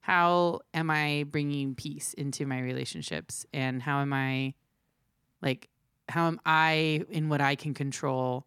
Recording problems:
none

